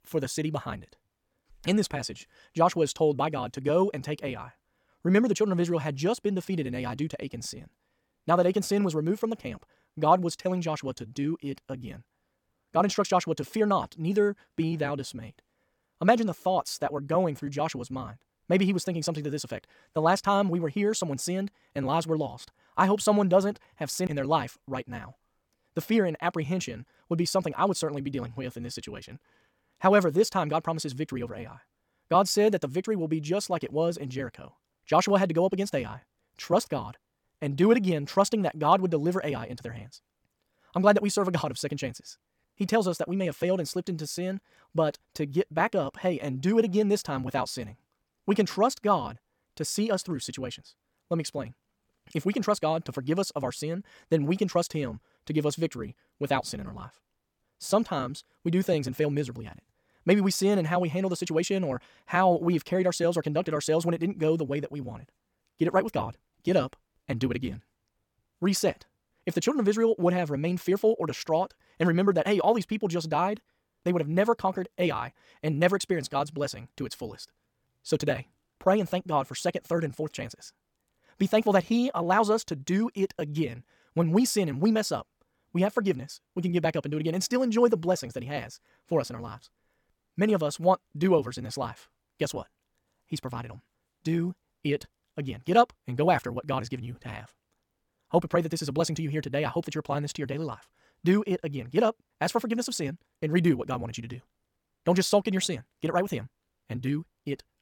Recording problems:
wrong speed, natural pitch; too fast; 1.6 times normal speed

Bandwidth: 18 kHz